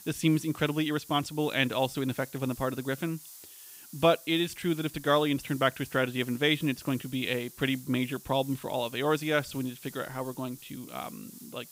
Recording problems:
hiss; noticeable; throughout; 15 dB below the speech

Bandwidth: 15.5 kHz